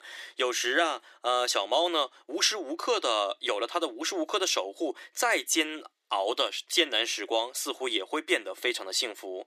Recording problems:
thin; very; fading below 350 Hz

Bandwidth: 14.5 kHz